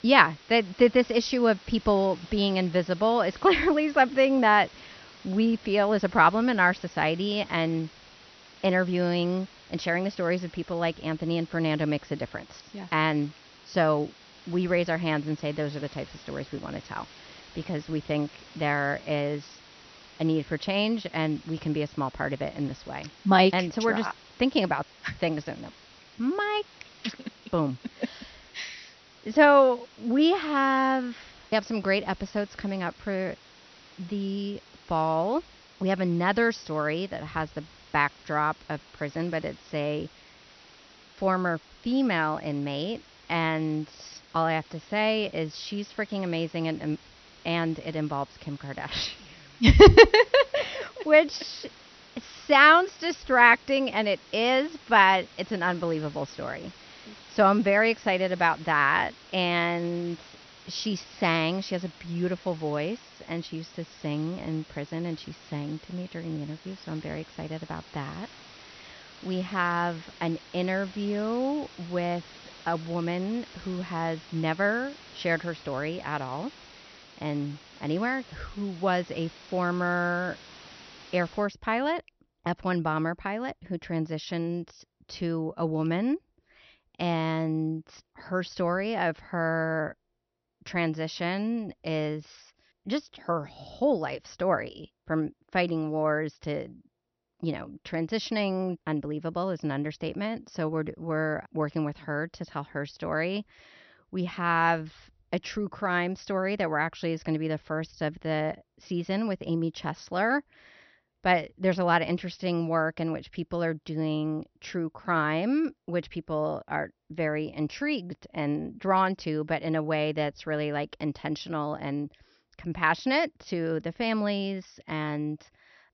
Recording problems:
high frequencies cut off; noticeable; nothing above 6 kHz
hiss; faint; until 1:21; 20 dB below the speech

